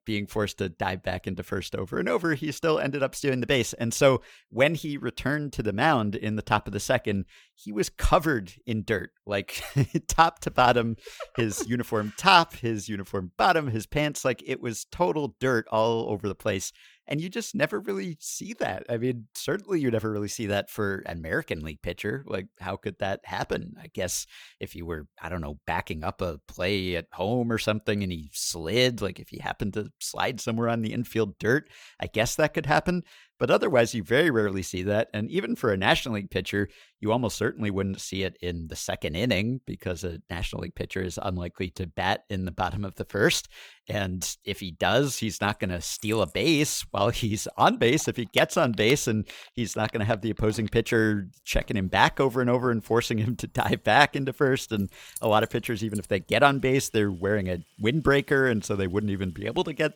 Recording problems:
household noises; noticeable; from 46 s on; 20 dB below the speech

